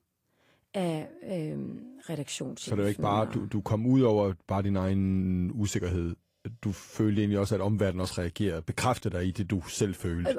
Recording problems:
garbled, watery; slightly; nothing above 14.5 kHz
abrupt cut into speech; at the end

